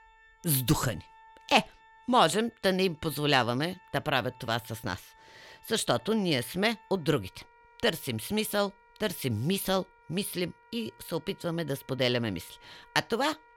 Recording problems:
background music; faint; throughout; 30 dB below the speech

